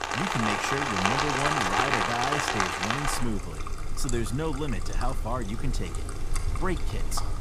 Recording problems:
rain or running water; very loud; throughout; 3 dB above the speech

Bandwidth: 15 kHz